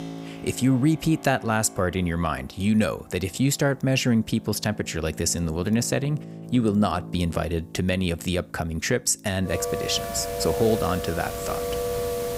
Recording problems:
background music; loud; throughout; 9 dB below the speech

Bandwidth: 15.5 kHz